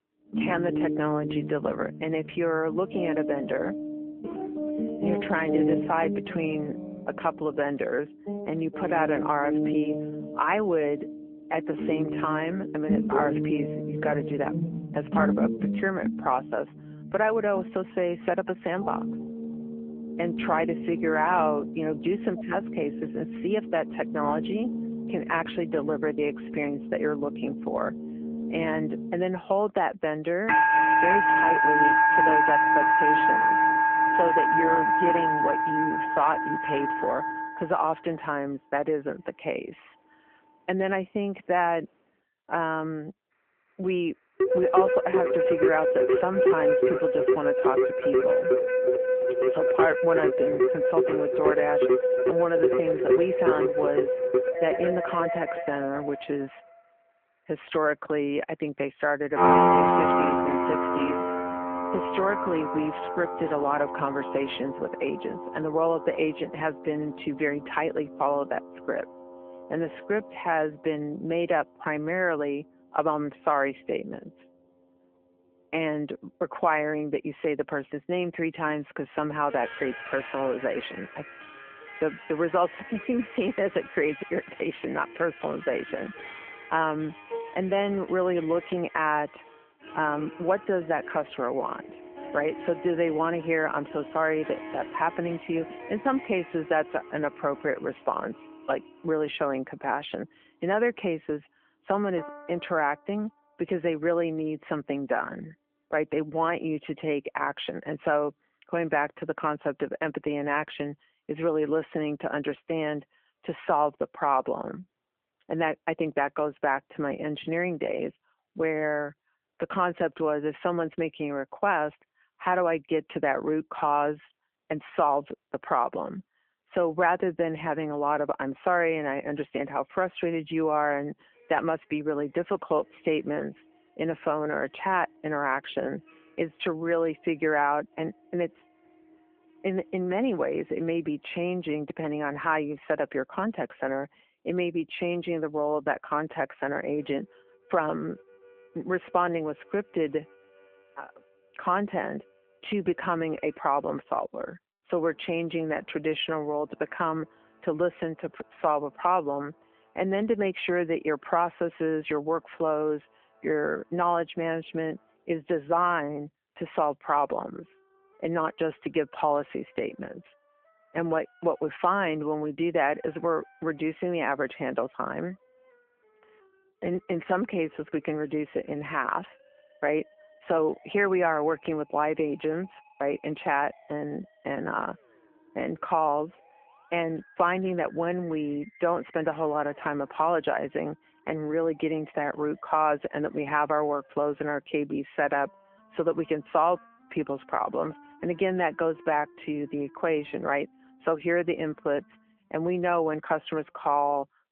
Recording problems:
phone-call audio; nothing above 3.5 kHz
background music; very loud; throughout; 2 dB above the speech

